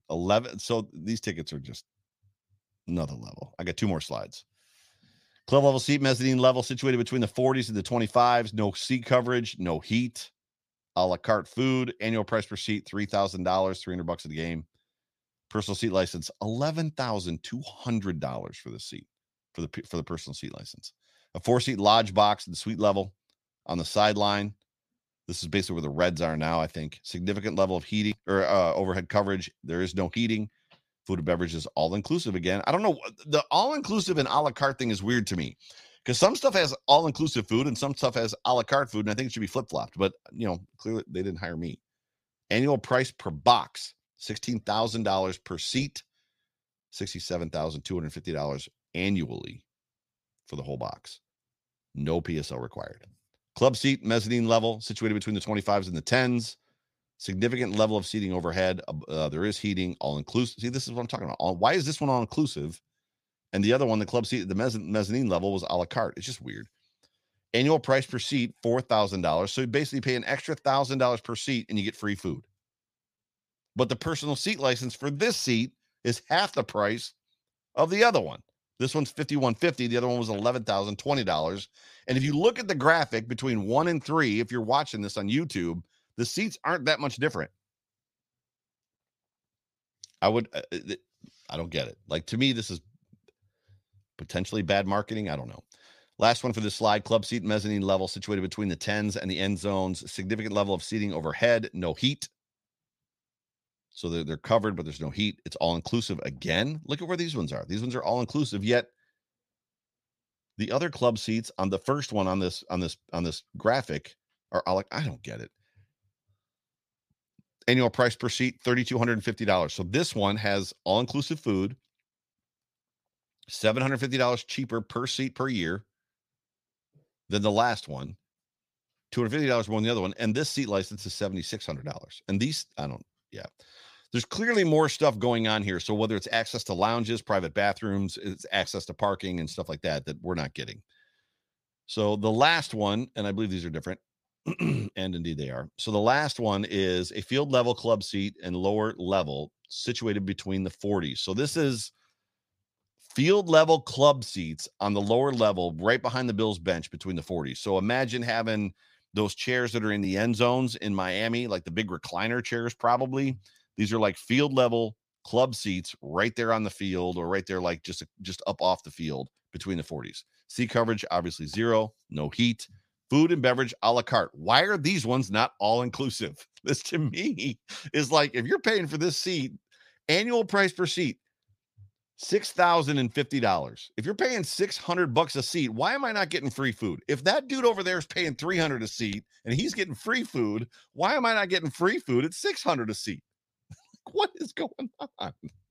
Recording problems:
none

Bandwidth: 15 kHz